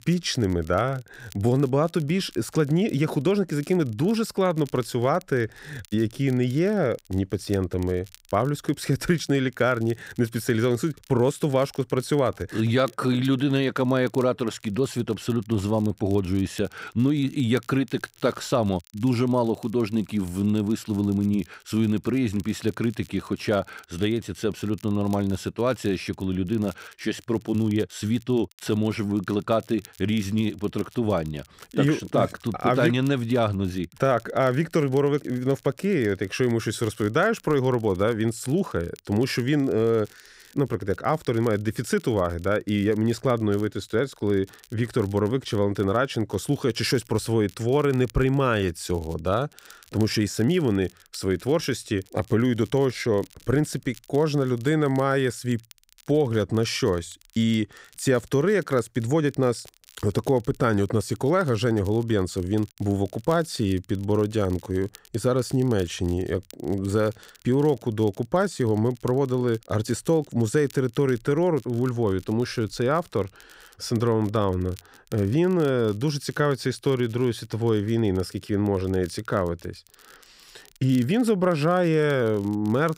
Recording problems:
crackle, like an old record; faint; 25 dB below the speech

